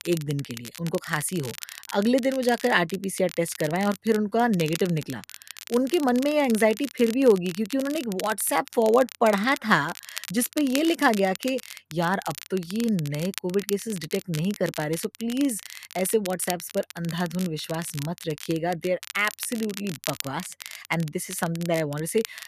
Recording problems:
crackle, like an old record; noticeable; 15 dB below the speech

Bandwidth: 14.5 kHz